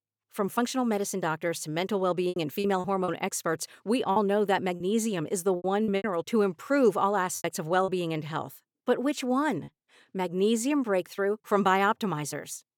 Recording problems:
choppy; very; at 2.5 s, from 4 to 8 s and at 9.5 s; 10% of the speech affected

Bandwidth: 18.5 kHz